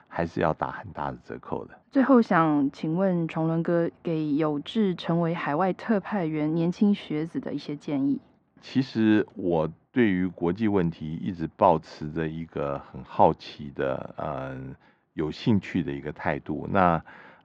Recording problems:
muffled; very; fading above 2 kHz

